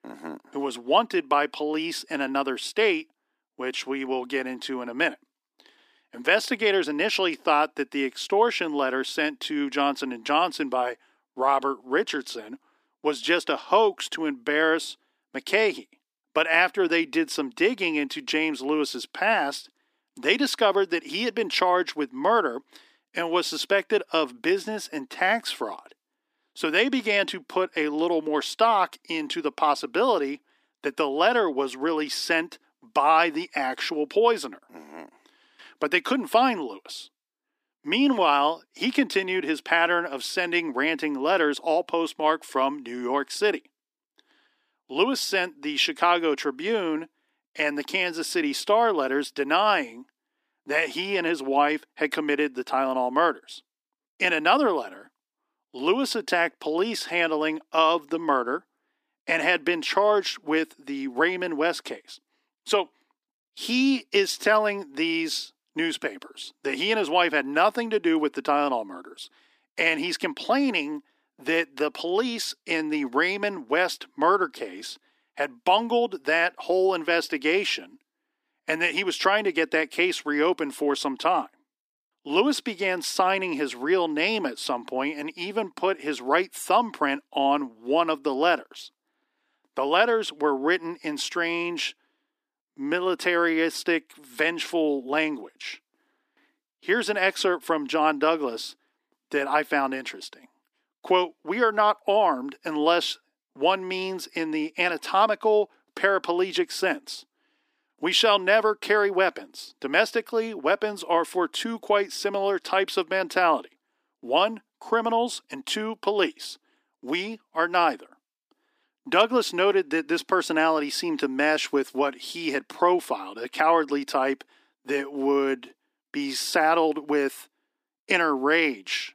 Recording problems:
thin; somewhat; fading below 300 Hz

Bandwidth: 15 kHz